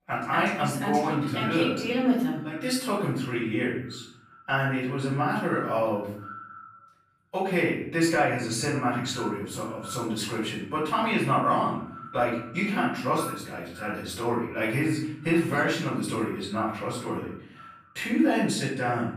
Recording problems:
off-mic speech; far
echo of what is said; noticeable; throughout; 330 ms later, 20 dB below the speech
room echo; noticeable; dies away in 0.7 s

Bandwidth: 15 kHz